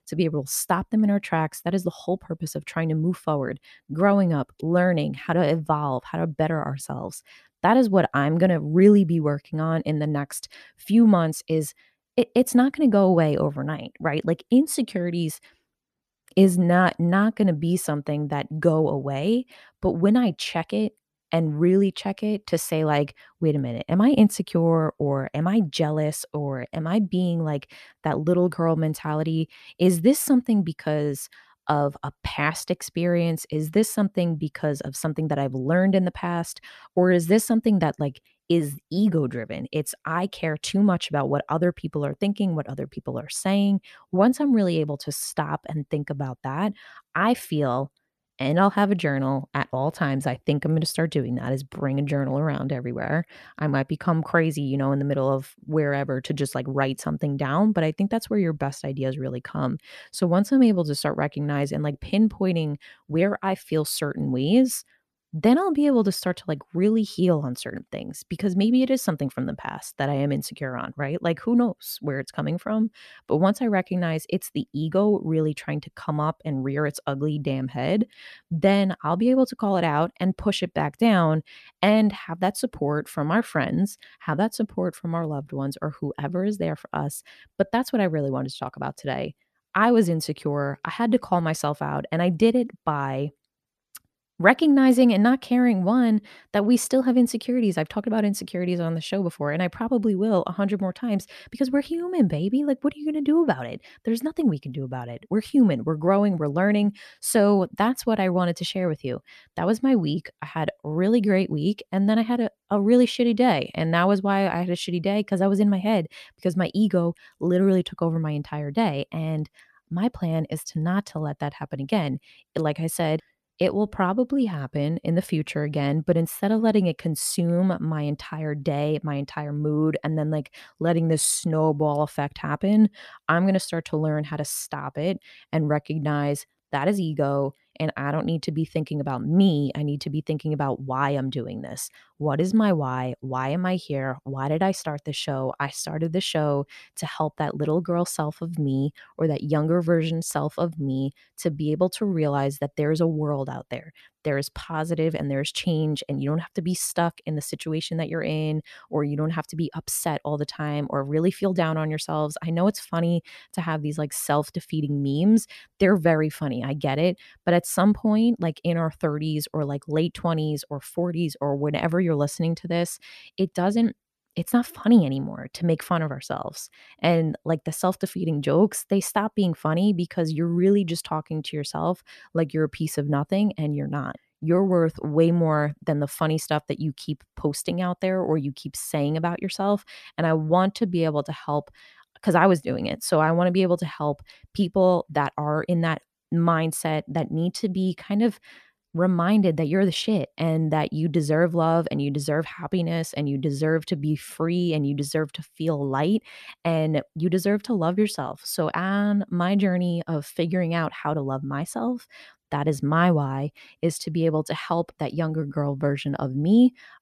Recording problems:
none

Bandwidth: 14 kHz